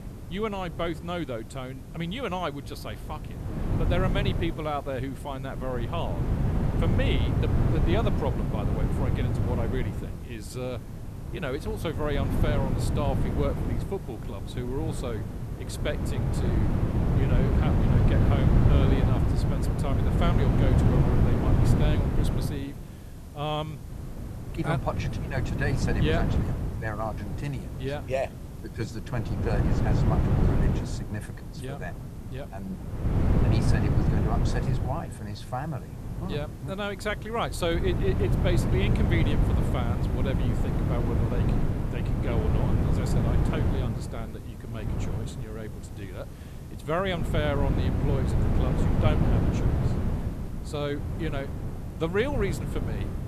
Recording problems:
wind noise on the microphone; heavy; 1 dB below the speech
hiss; faint; throughout; 25 dB below the speech

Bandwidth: 14 kHz